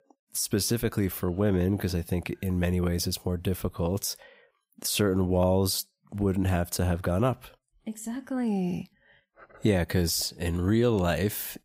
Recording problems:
none

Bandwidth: 15.5 kHz